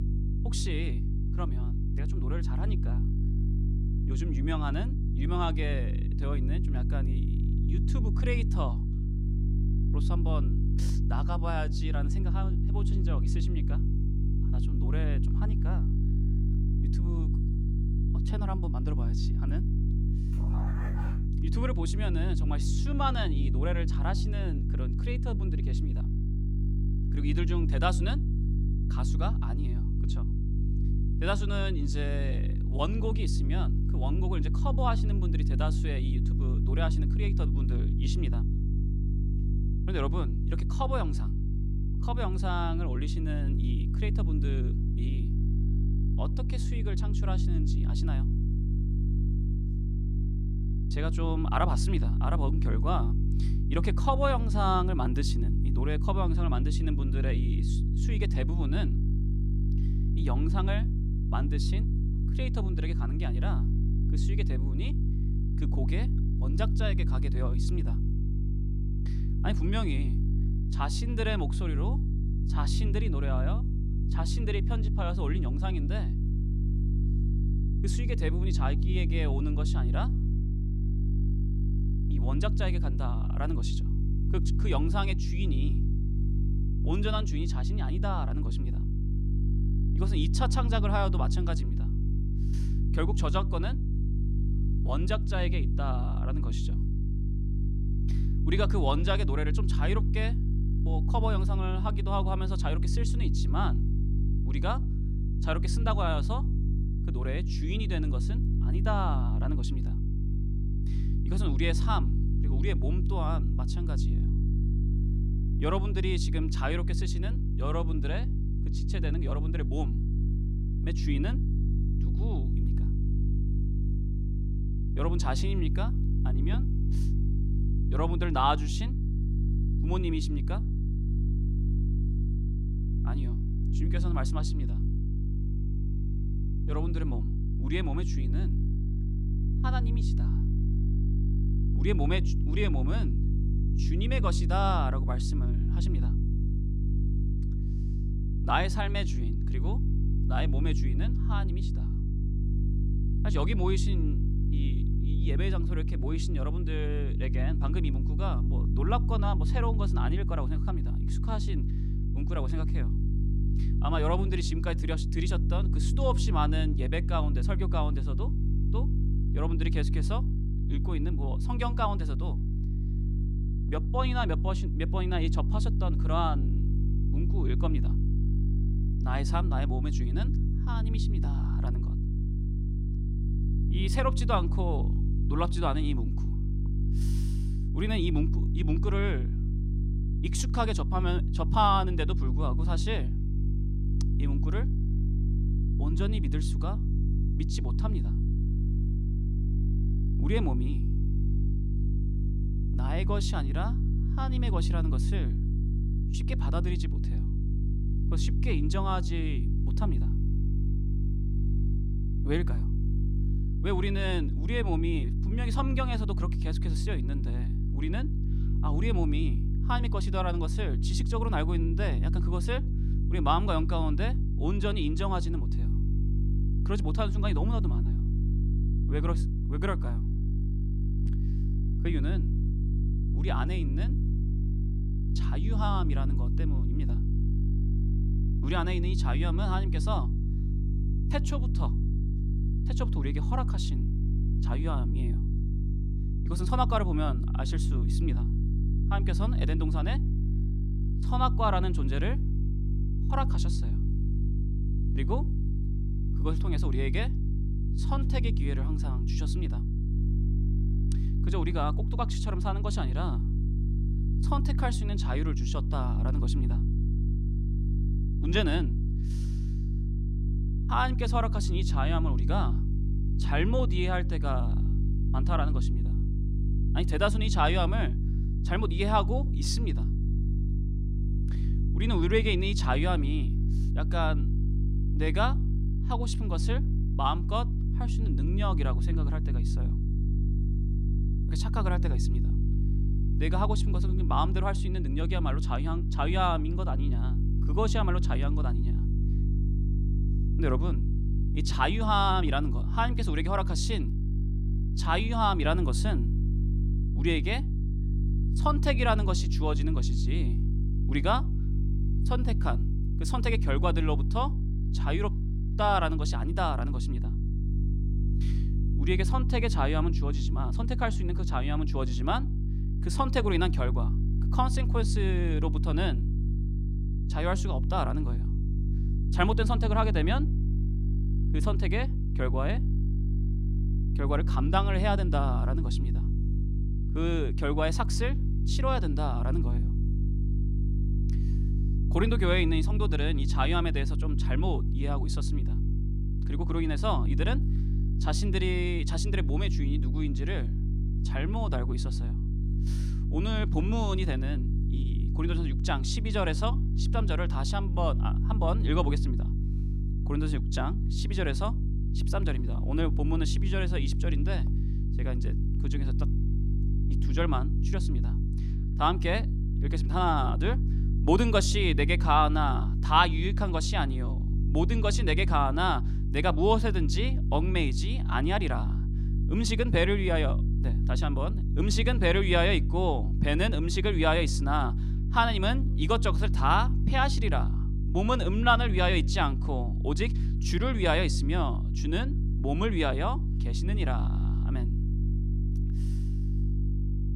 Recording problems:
electrical hum; noticeable; throughout; 50 Hz, 10 dB below the speech
dog barking; noticeable; from 20 to 21 s; peak 9 dB below the speech

